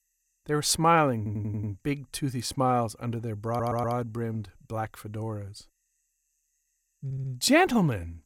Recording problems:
audio stuttering; at 1 s, at 3.5 s and at 7 s

